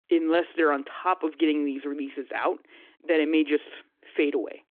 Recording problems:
phone-call audio

